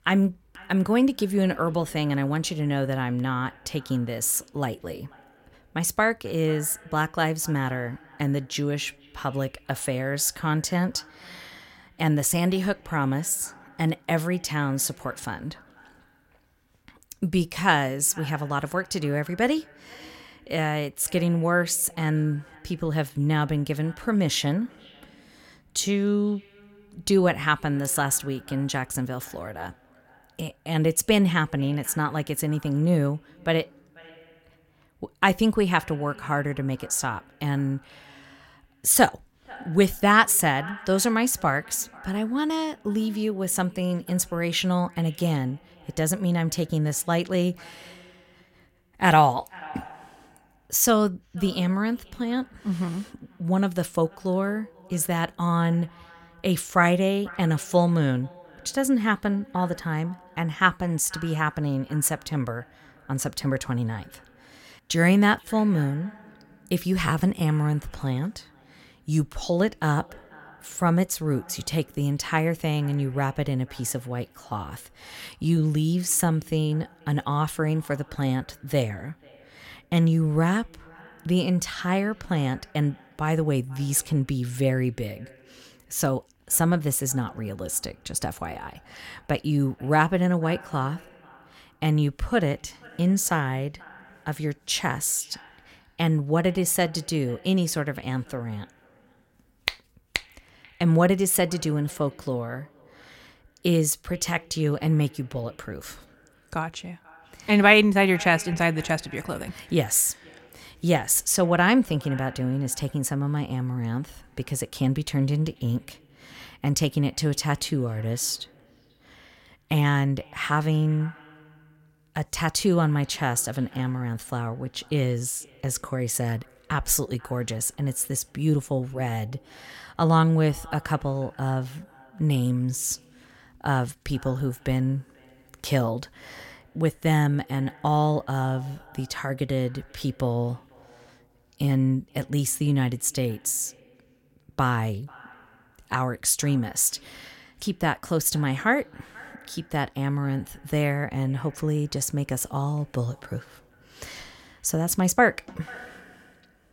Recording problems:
echo of what is said; faint; throughout; 490 ms later, 25 dB below the speech

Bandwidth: 16.5 kHz